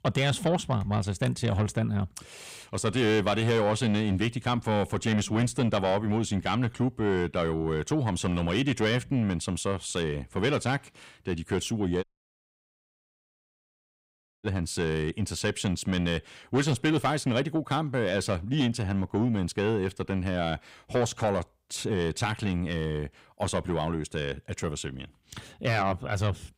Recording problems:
distortion; slight; 9 dB below the speech
audio cutting out; at 12 s for 2.5 s

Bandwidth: 15.5 kHz